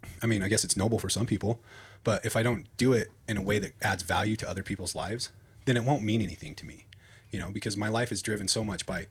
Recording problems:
wrong speed, natural pitch; too fast; 1.5 times normal speed

